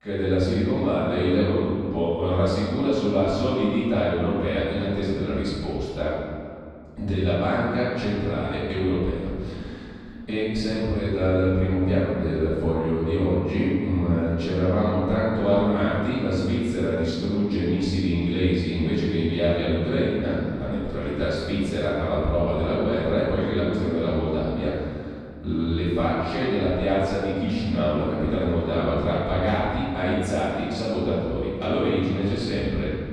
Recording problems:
room echo; strong; dies away in 2.1 s
off-mic speech; far

